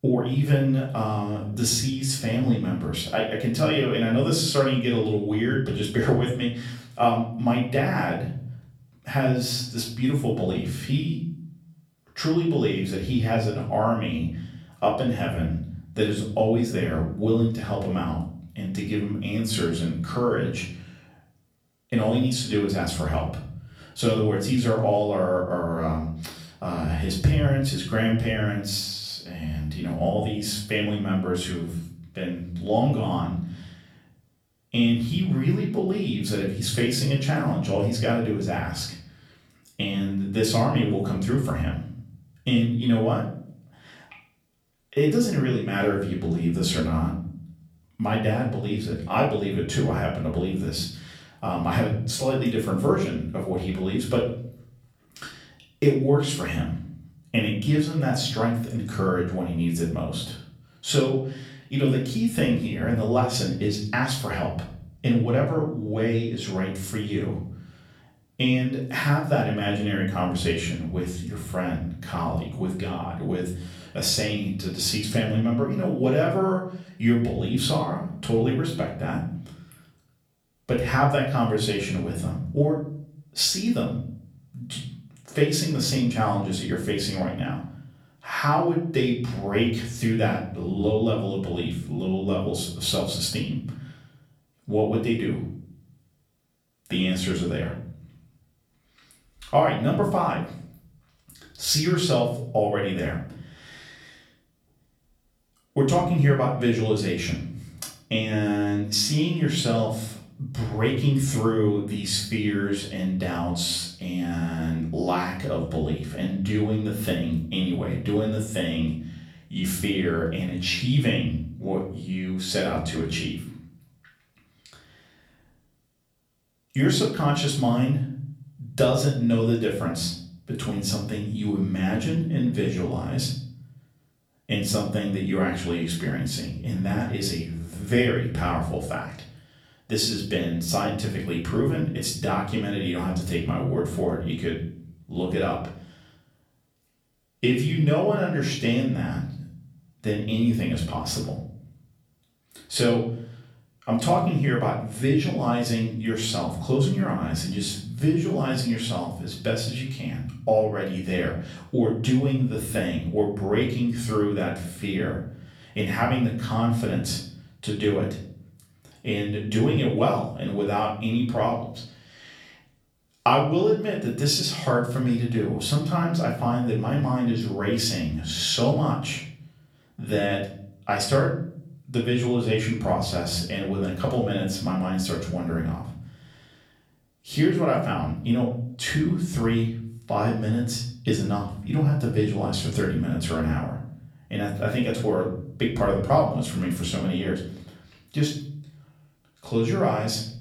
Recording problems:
off-mic speech; far
room echo; slight; dies away in 0.6 s

